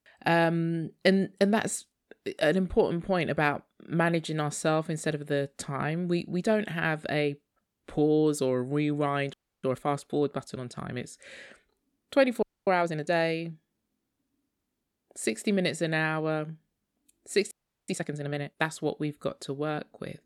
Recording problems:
audio freezing; at 9.5 s, at 12 s and at 18 s

